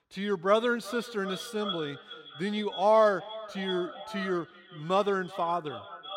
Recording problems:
echo of what is said; noticeable; throughout; 380 ms later, 10 dB below the speech

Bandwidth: 16 kHz